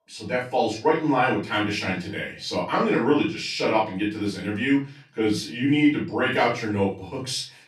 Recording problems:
off-mic speech; far
room echo; slight; dies away in 0.3 s

